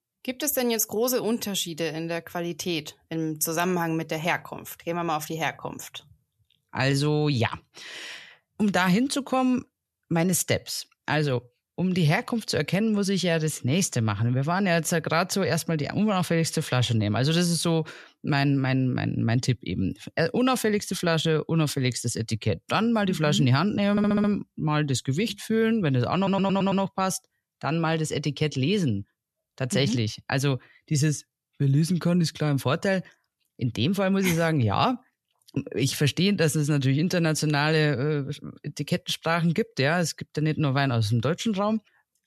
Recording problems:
audio stuttering; at 24 s and at 26 s

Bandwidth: 13.5 kHz